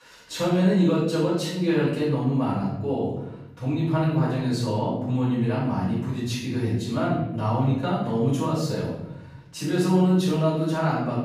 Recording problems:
off-mic speech; far
room echo; noticeable; dies away in 1 s

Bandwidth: 14.5 kHz